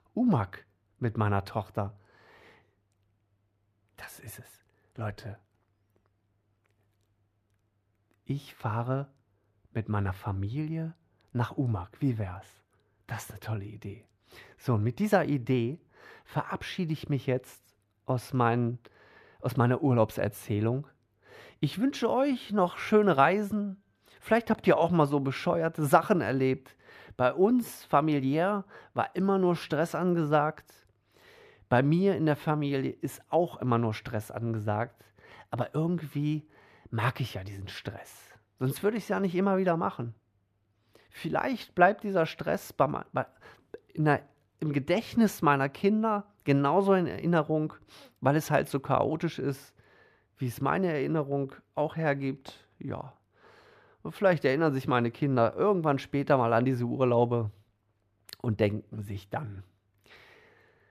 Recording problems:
muffled; slightly; fading above 4 kHz

